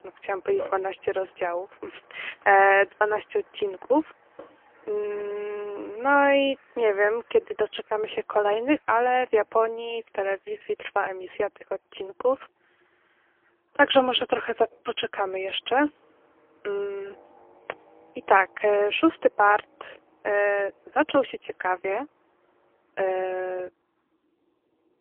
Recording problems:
phone-call audio; poor line; nothing above 3.5 kHz
traffic noise; faint; throughout; 25 dB below the speech

